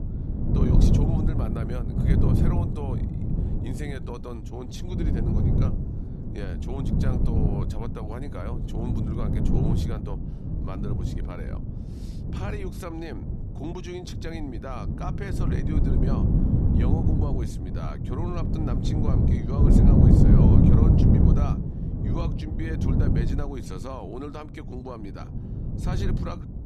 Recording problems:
wind noise on the microphone; heavy; 4 dB above the speech

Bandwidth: 14 kHz